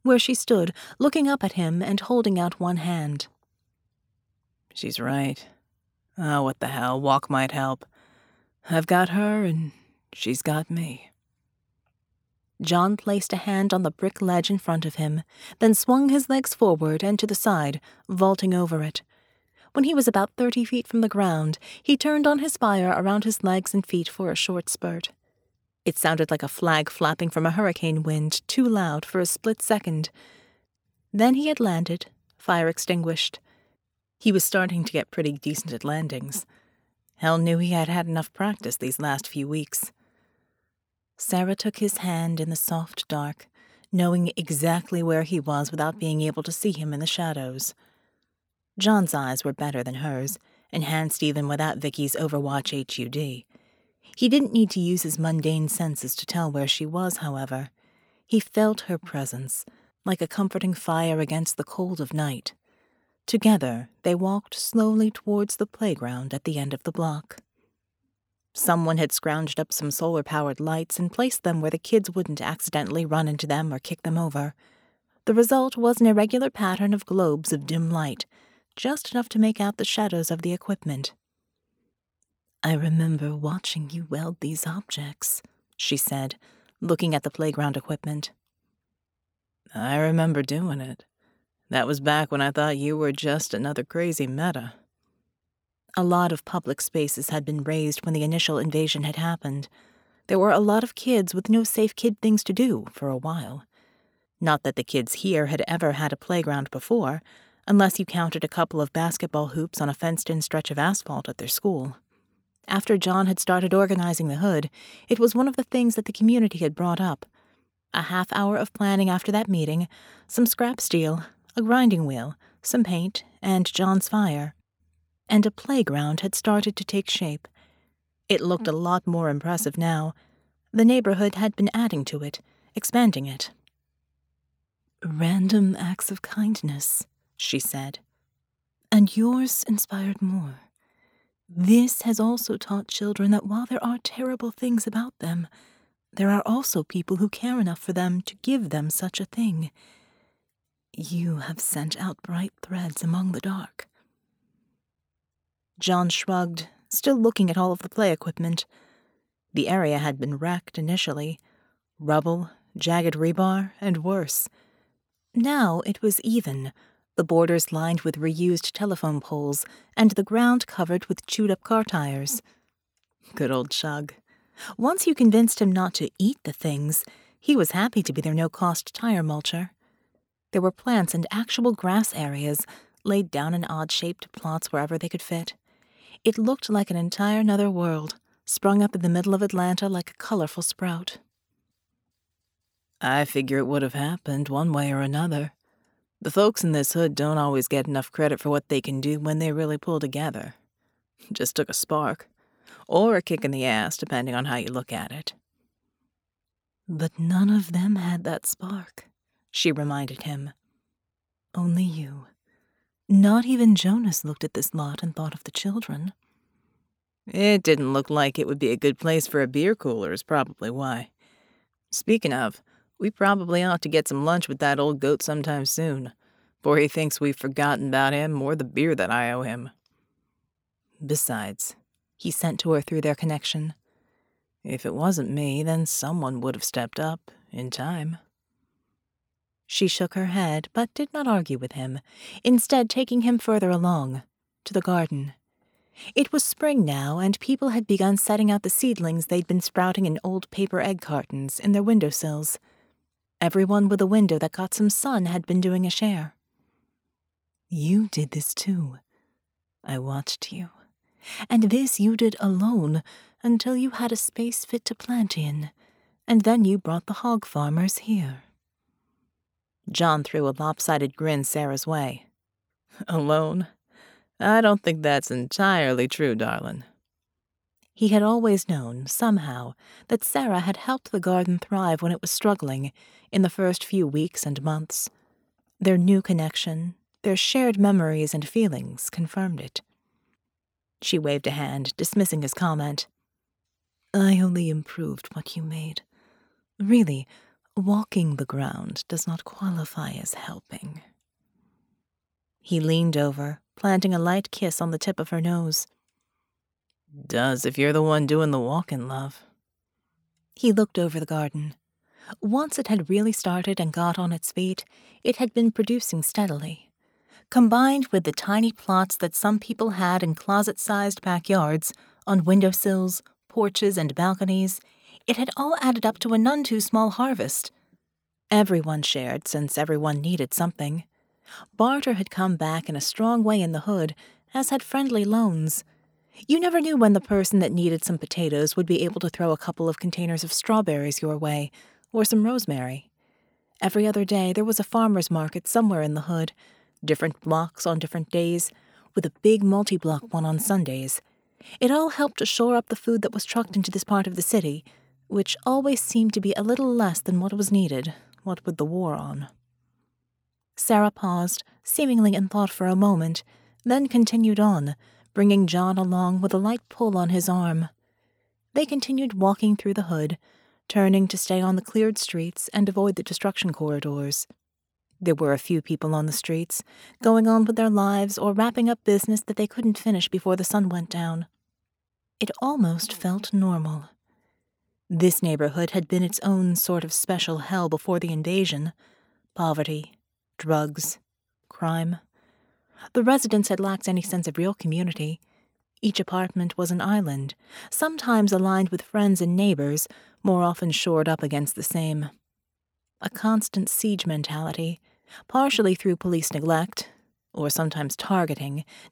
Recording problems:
none

